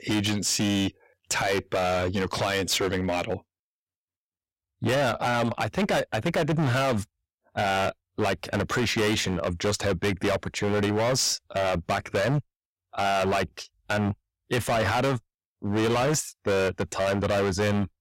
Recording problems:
distortion; heavy; 21% of the sound clipped

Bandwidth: 16 kHz